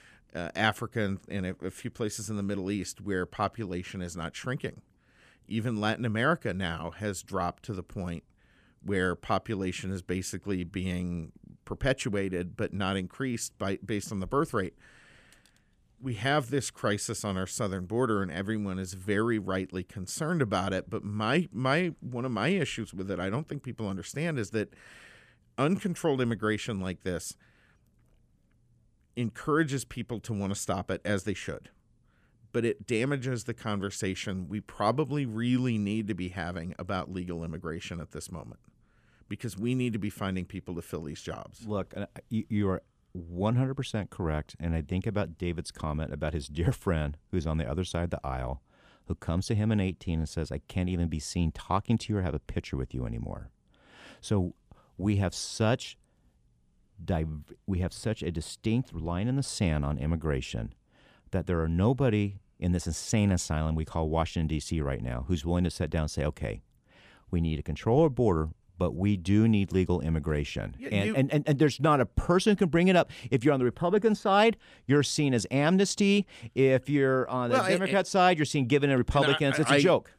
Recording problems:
none

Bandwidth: 14.5 kHz